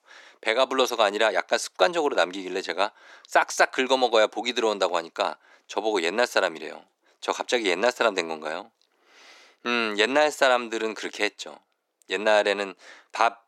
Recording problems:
thin; somewhat; fading below 350 Hz

